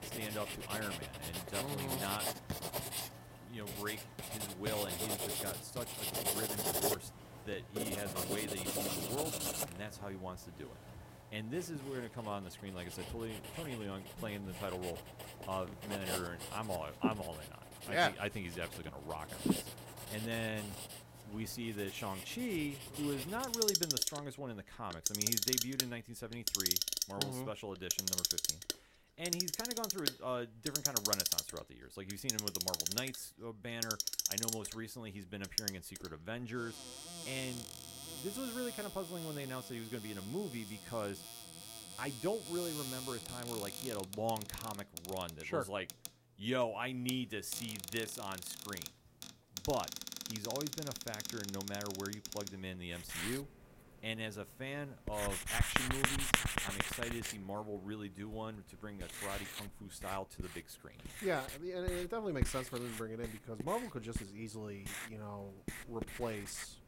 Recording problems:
household noises; very loud; throughout; 3 dB above the speech

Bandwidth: 16 kHz